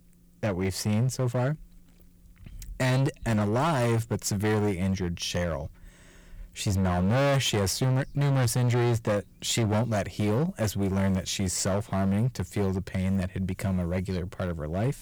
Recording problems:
distortion; heavy; 15% of the sound clipped

